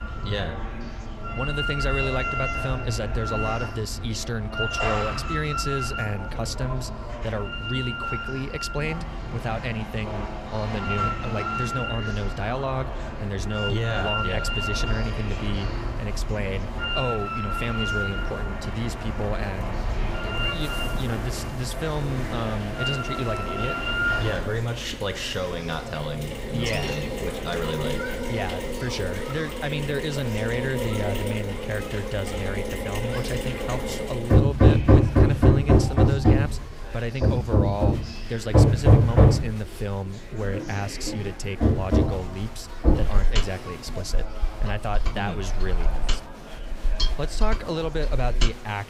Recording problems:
machinery noise; very loud; throughout; 4 dB above the speech
chatter from many people; loud; throughout; 10 dB below the speech

